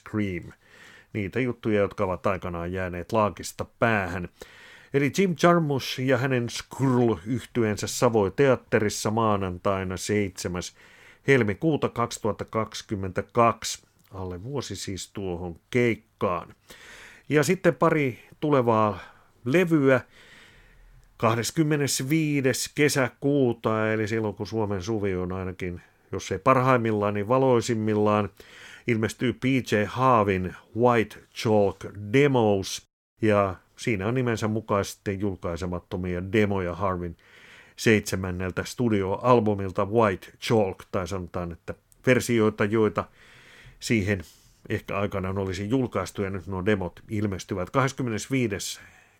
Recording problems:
none

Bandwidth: 17 kHz